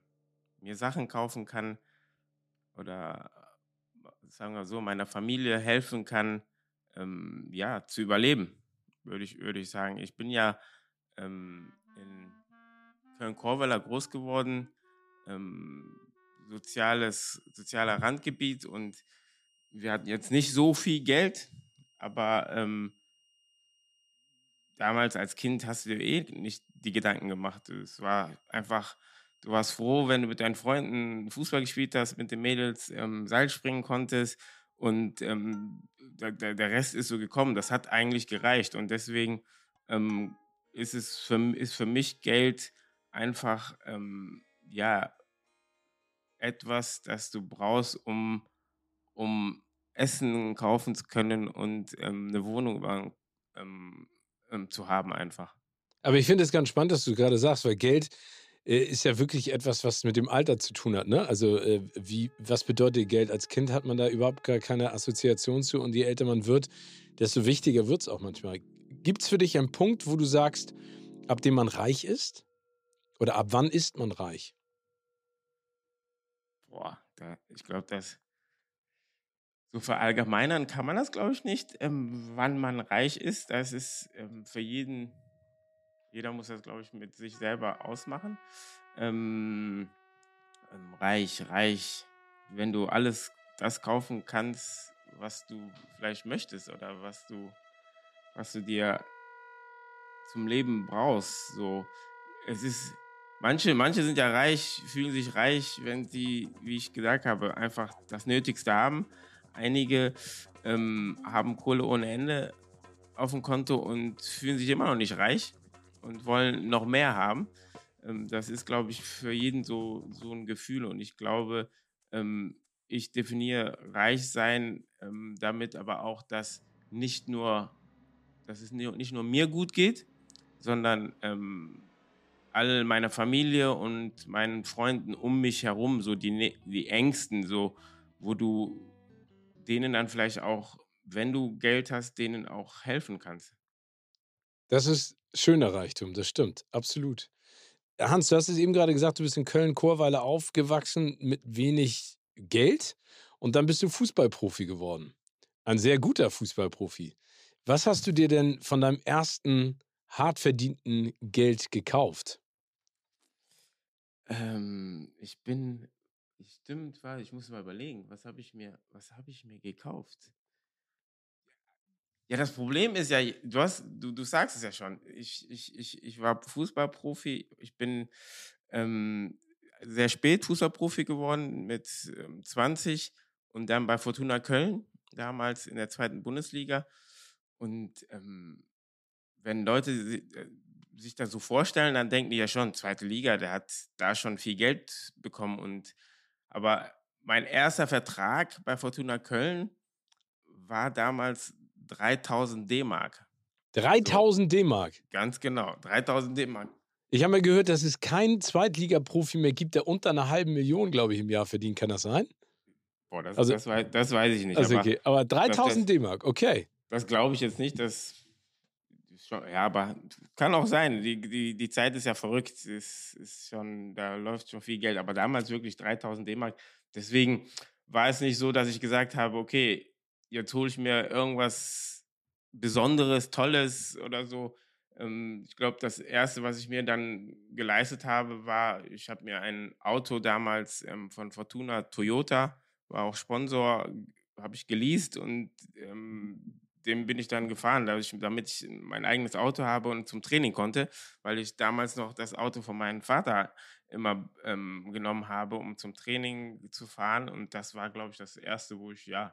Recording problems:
background music; faint; until 2:20; 30 dB below the speech

